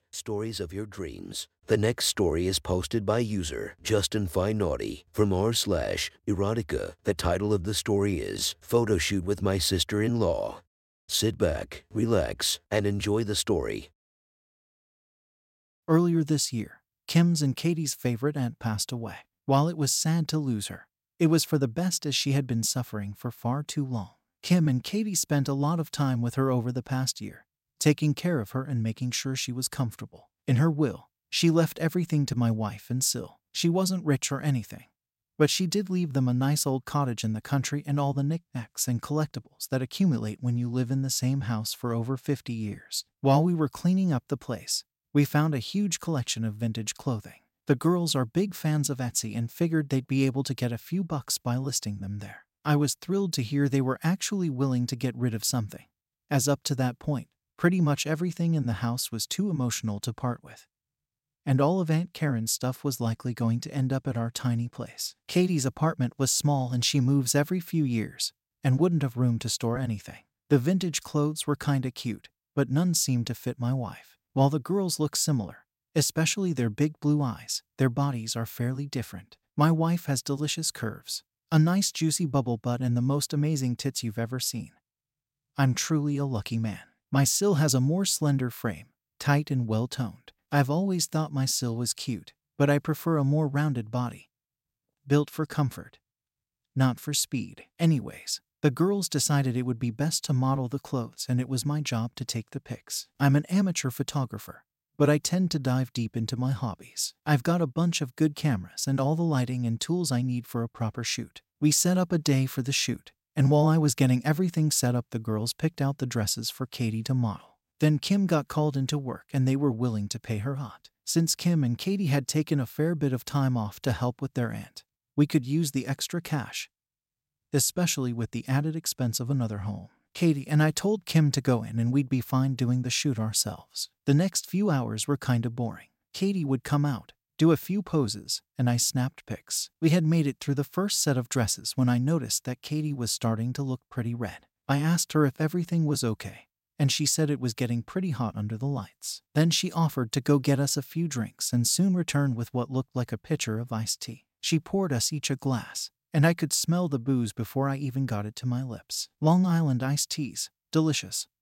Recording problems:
none

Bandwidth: 16 kHz